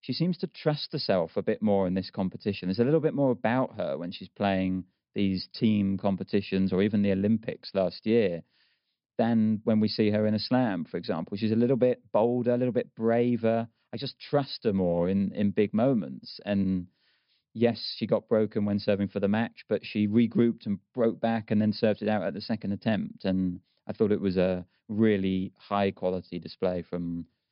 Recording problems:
high frequencies cut off; noticeable; nothing above 5.5 kHz

